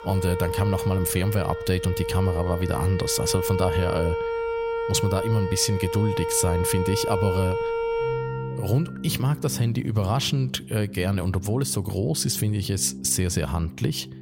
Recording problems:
background music; loud; throughout; 5 dB below the speech

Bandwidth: 16 kHz